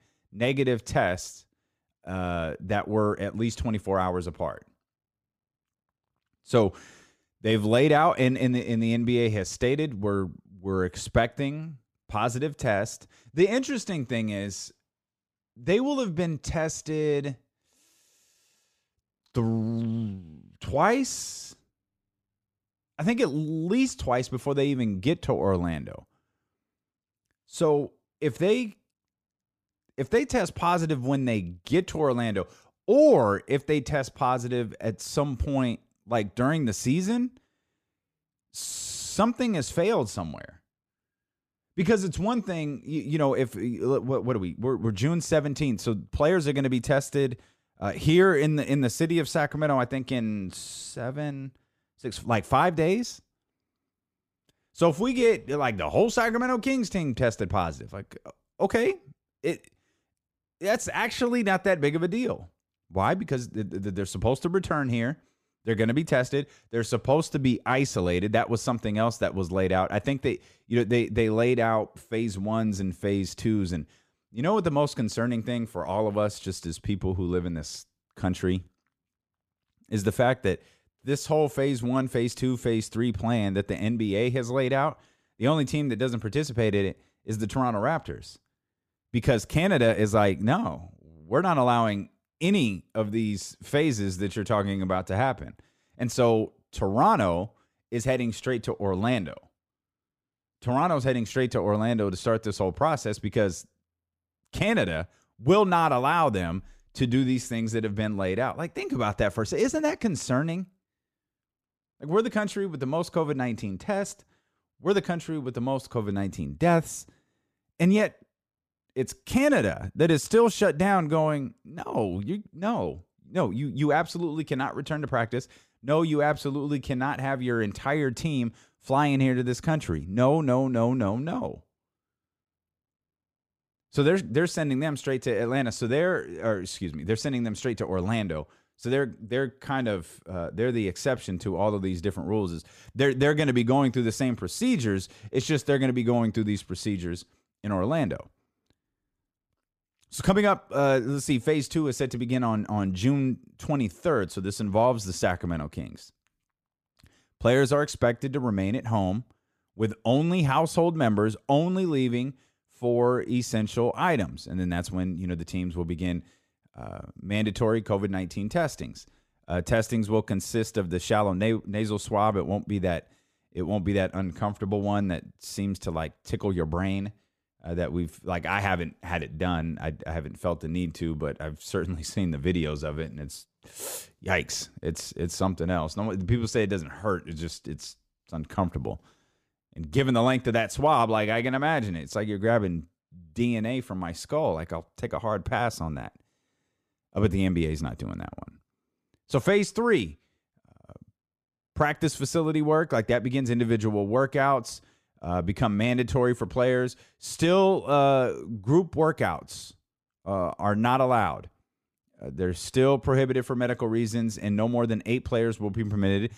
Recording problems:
none

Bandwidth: 15 kHz